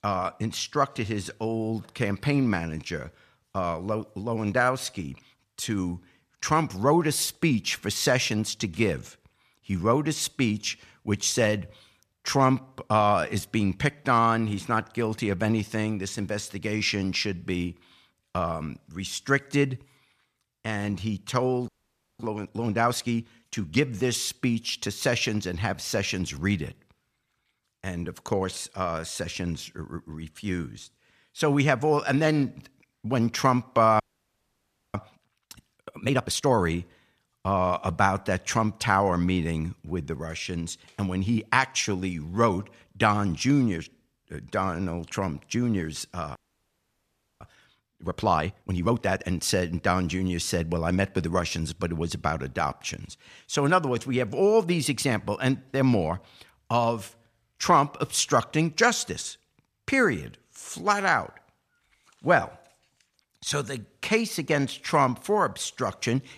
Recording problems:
audio freezing; at 22 s for 0.5 s, at 34 s for 1 s and at 46 s for 1 s

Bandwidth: 14.5 kHz